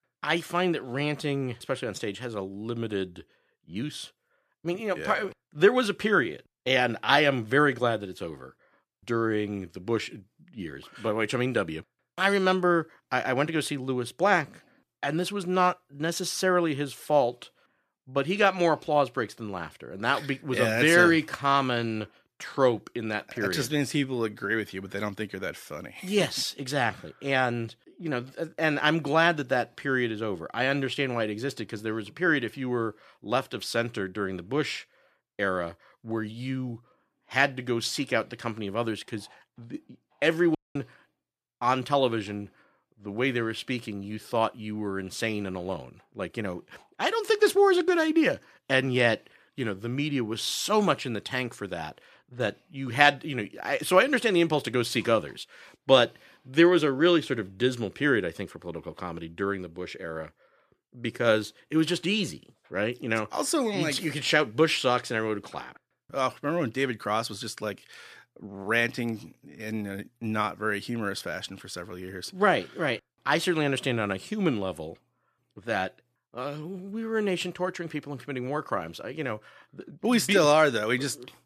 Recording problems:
audio cutting out; at 41 s

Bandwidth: 14.5 kHz